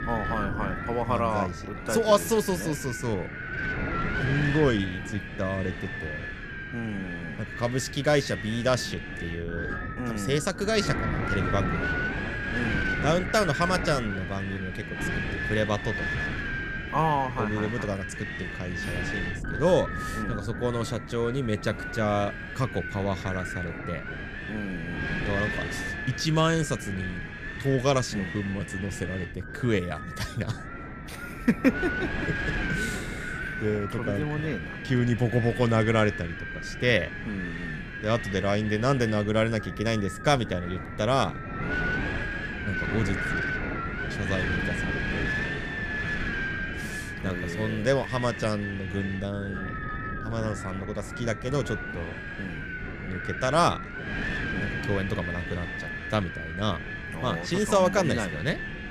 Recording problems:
wind noise on the microphone; heavy; 3 dB below the speech

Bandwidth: 14.5 kHz